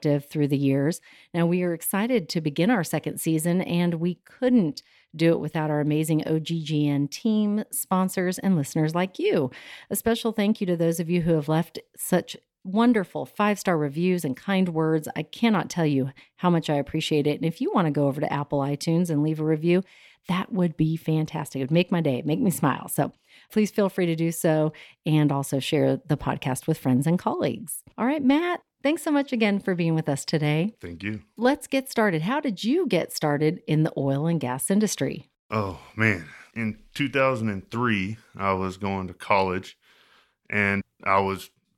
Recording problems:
none

